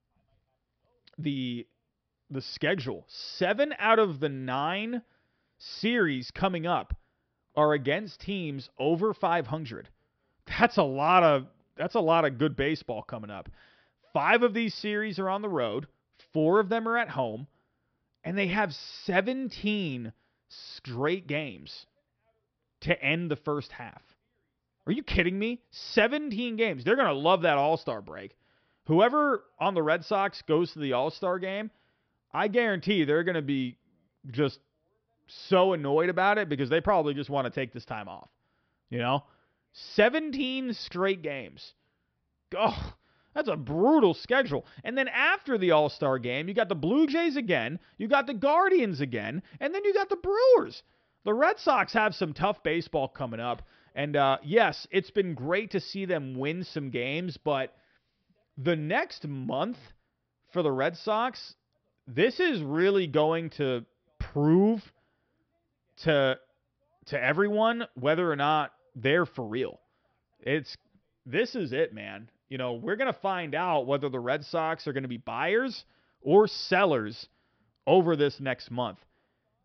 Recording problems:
high frequencies cut off; noticeable; nothing above 5.5 kHz

